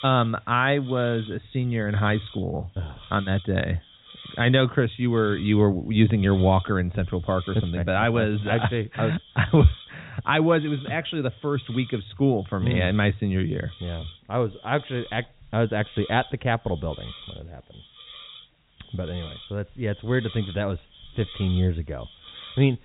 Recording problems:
high frequencies cut off; severe; nothing above 4 kHz
hiss; noticeable; throughout; 20 dB below the speech

